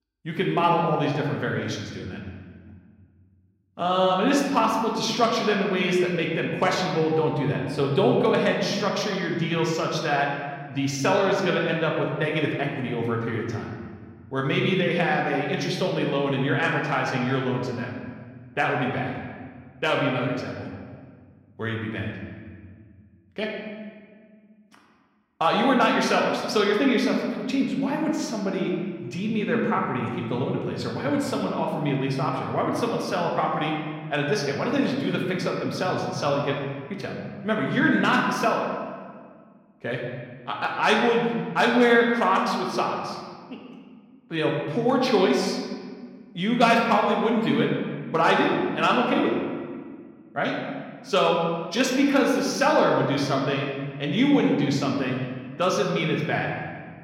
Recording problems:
room echo; noticeable; dies away in 1.6 s
off-mic speech; somewhat distant

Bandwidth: 16.5 kHz